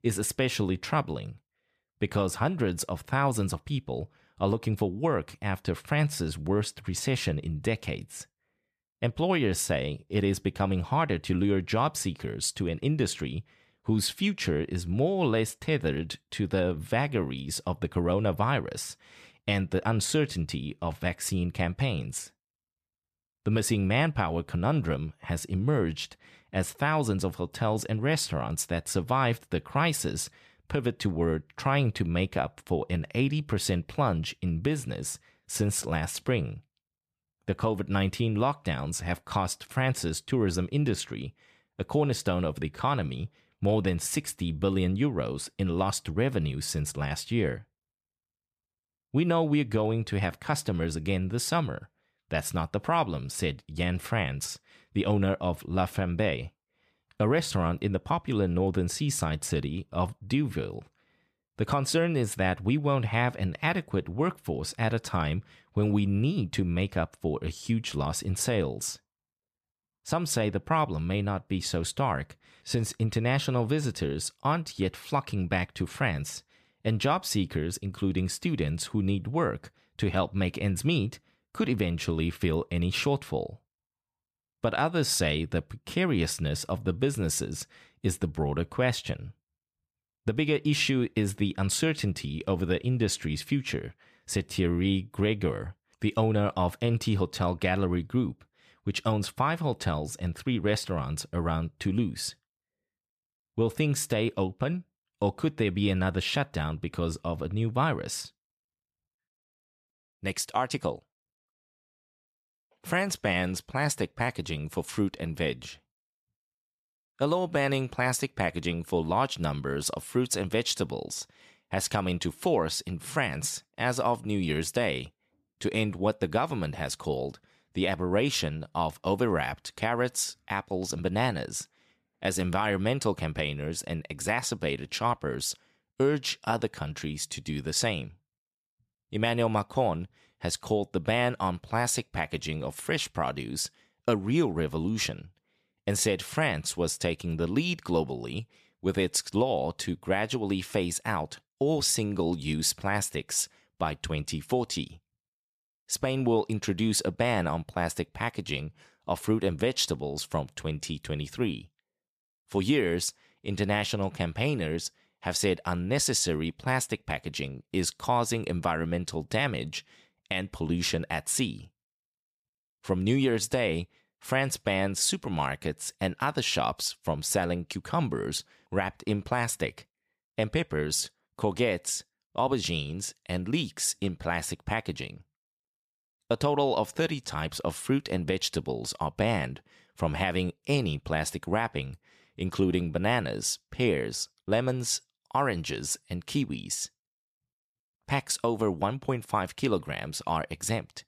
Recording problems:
none

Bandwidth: 14.5 kHz